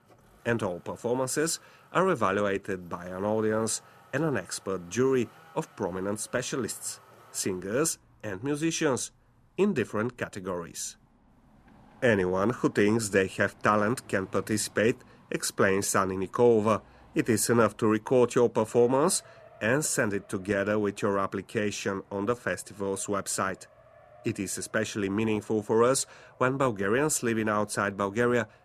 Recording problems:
traffic noise; faint; throughout; 30 dB below the speech

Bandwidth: 14.5 kHz